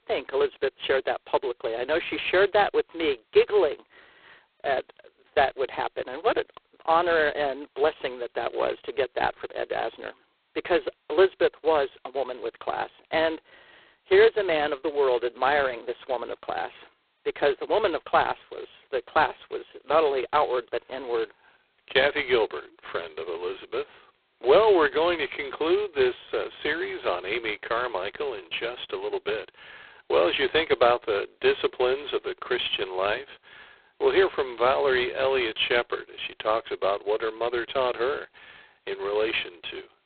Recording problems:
phone-call audio; poor line; nothing above 4 kHz

